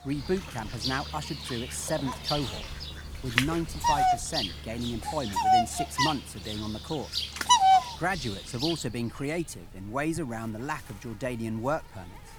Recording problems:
animal sounds; very loud; throughout; 5 dB above the speech

